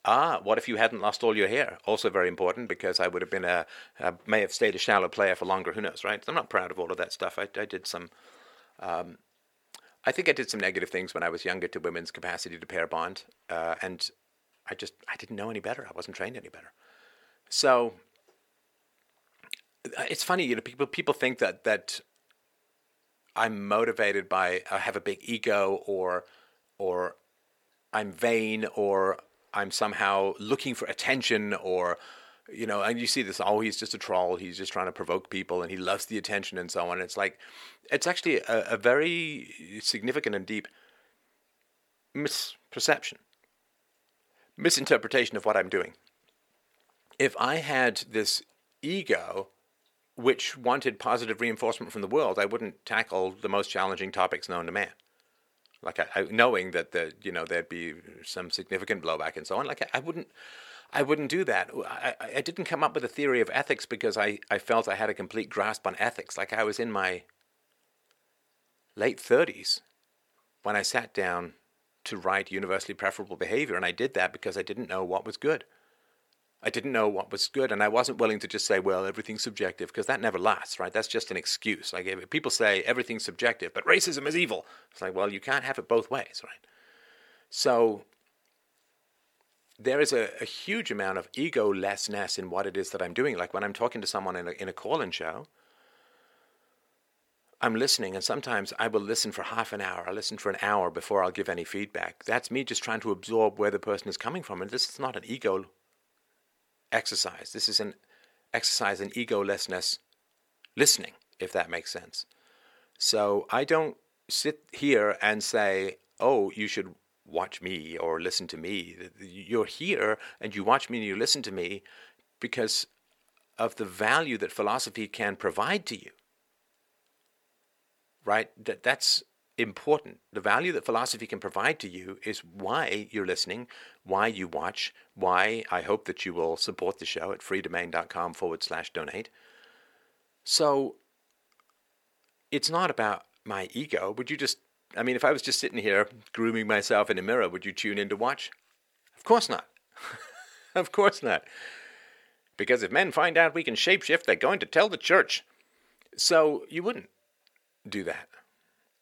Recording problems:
thin; somewhat; fading below 650 Hz

